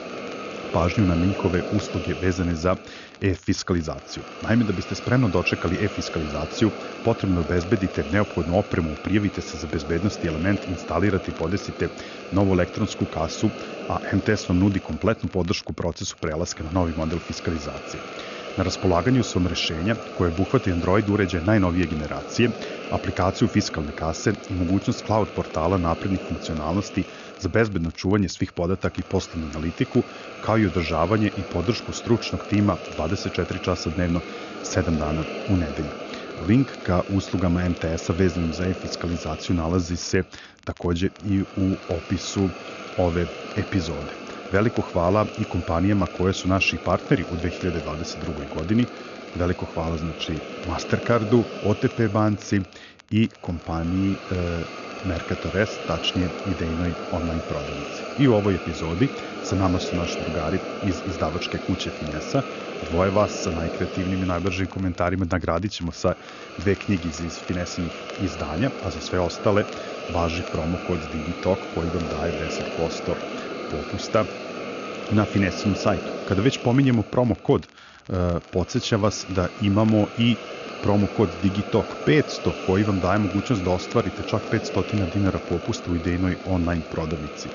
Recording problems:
high frequencies cut off; noticeable; nothing above 7 kHz
hiss; loud; throughout; 10 dB below the speech
crackle, like an old record; faint; 25 dB below the speech

